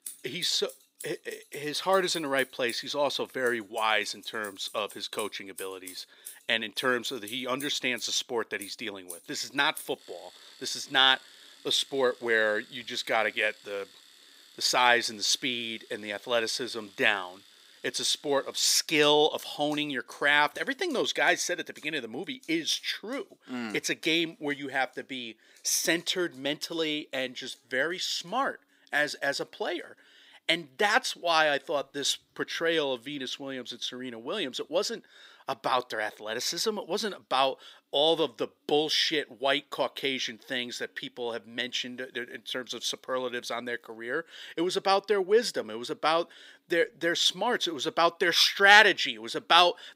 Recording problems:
thin; very slightly; fading below 350 Hz
household noises; faint; throughout; 20 dB below the speech

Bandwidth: 15.5 kHz